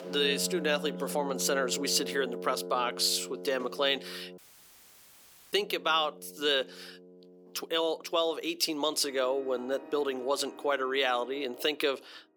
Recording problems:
thin; somewhat; fading below 300 Hz
background music; noticeable; throughout; 15 dB below the speech
audio cutting out; at 4.5 s for 1 s

